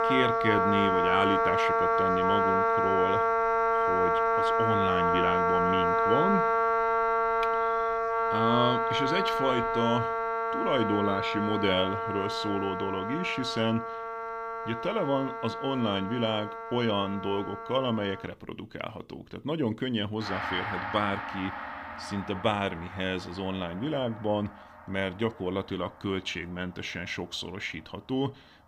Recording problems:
background music; very loud; throughout; 3 dB above the speech

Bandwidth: 15.5 kHz